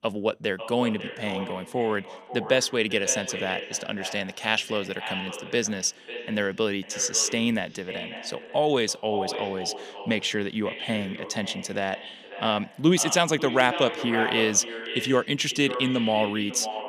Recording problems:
echo of what is said; strong; throughout; 550 ms later, 10 dB below the speech

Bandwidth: 15 kHz